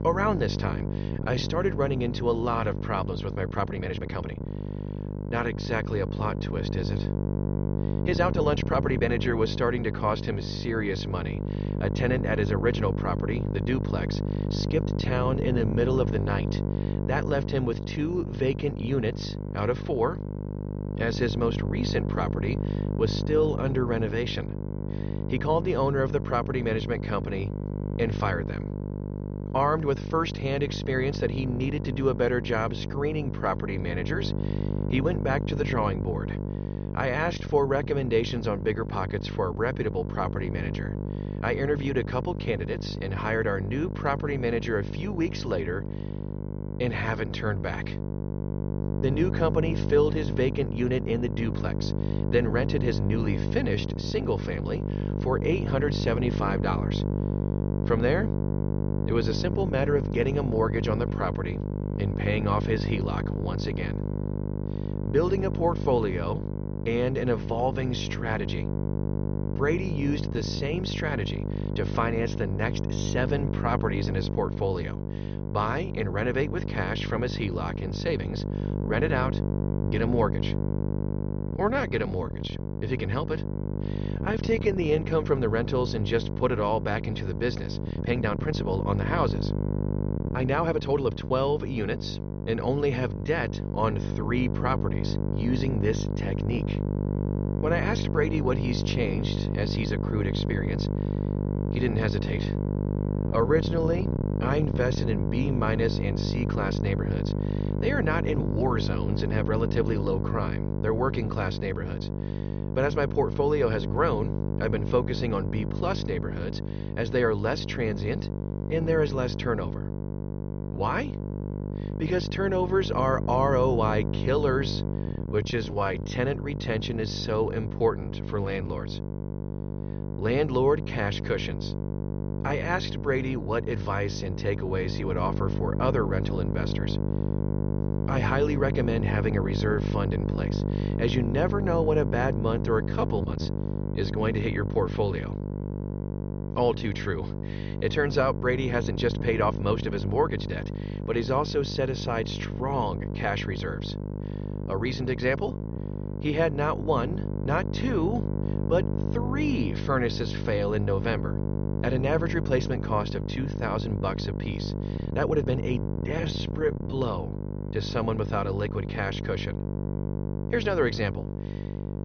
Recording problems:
high frequencies cut off; noticeable; nothing above 6 kHz
electrical hum; loud; throughout; 50 Hz, 8 dB below the speech
uneven, jittery; strongly; from 1 s to 2:47

